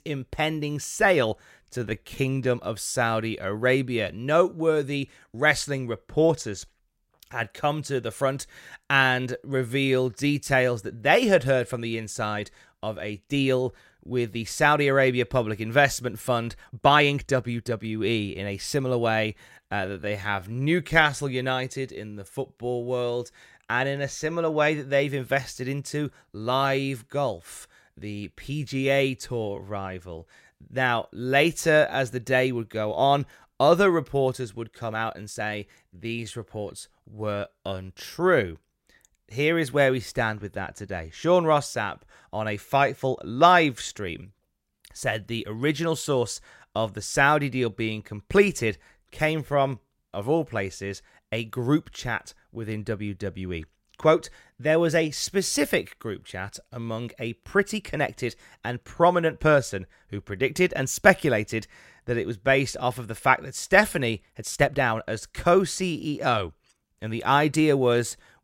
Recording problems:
uneven, jittery; strongly; from 1.5 s to 1:07

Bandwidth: 16 kHz